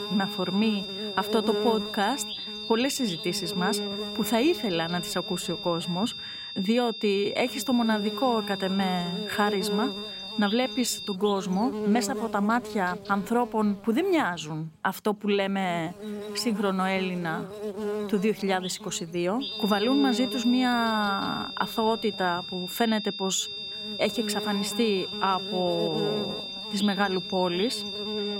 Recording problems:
high-pitched whine; loud; until 11 s and from 19 s on; 3.5 kHz, 7 dB below the speech
electrical hum; noticeable; throughout; 60 Hz, 10 dB below the speech

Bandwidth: 16 kHz